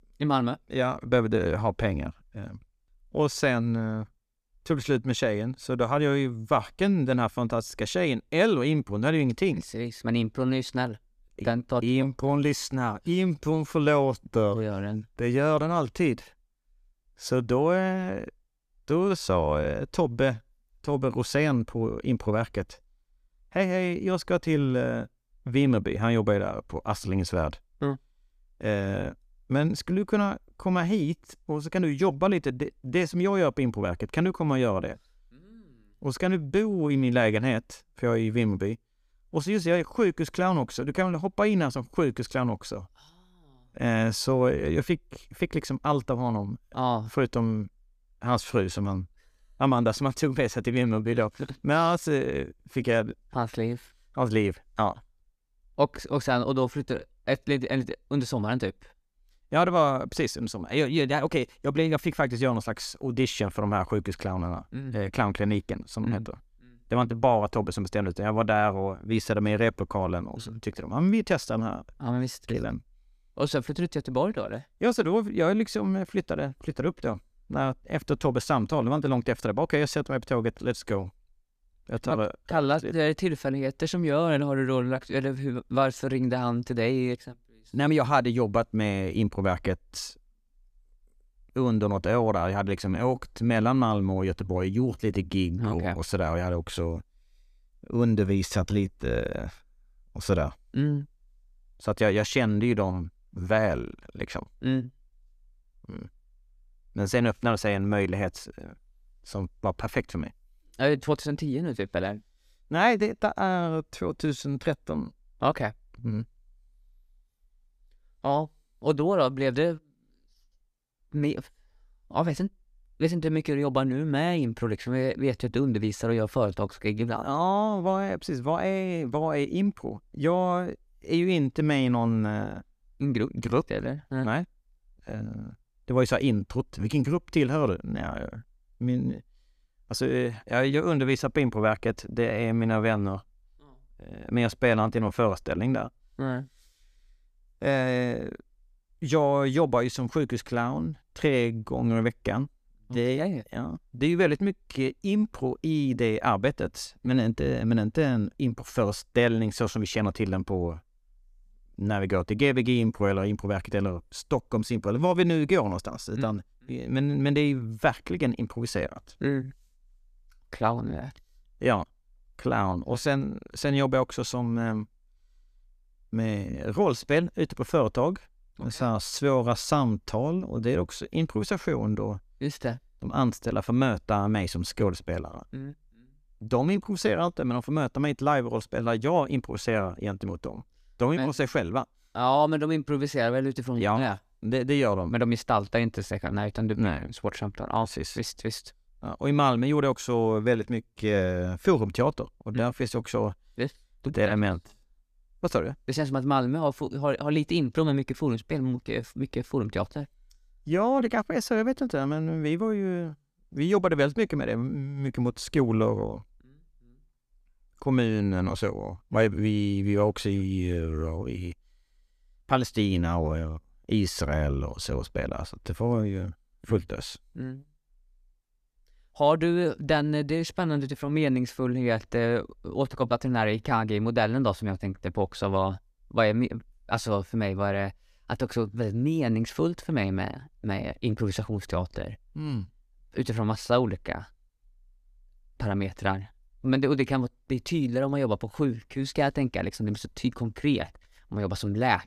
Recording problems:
none

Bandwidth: 14.5 kHz